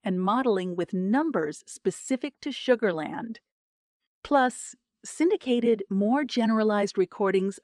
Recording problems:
none

